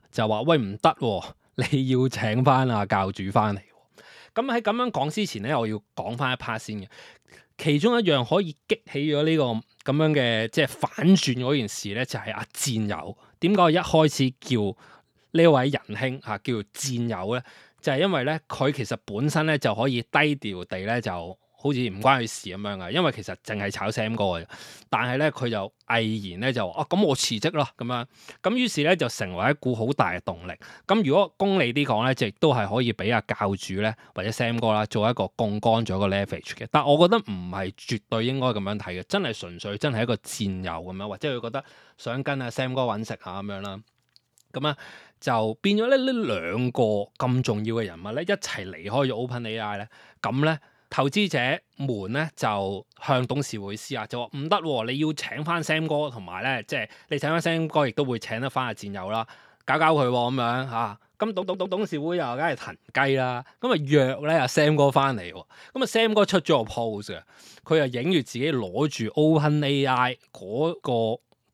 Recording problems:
audio stuttering; at 1:01

